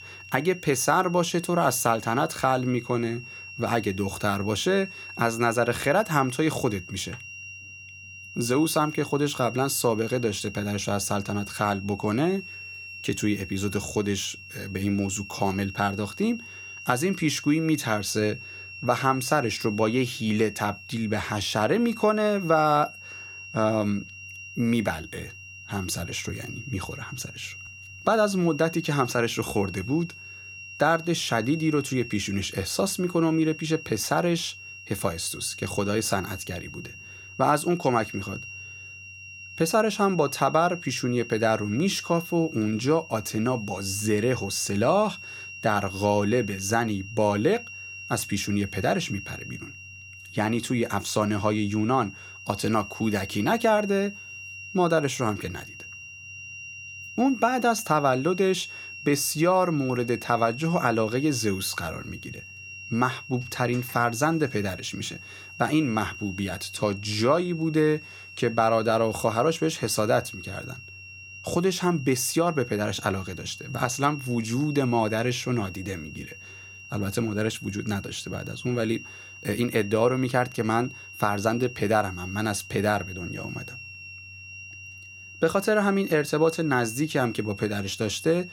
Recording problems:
high-pitched whine; noticeable; throughout; 3 kHz, 15 dB below the speech

